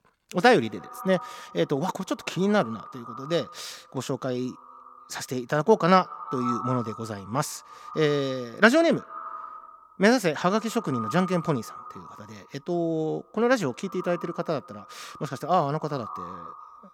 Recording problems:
echo of what is said; noticeable; throughout; 160 ms later, 15 dB below the speech

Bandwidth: 18 kHz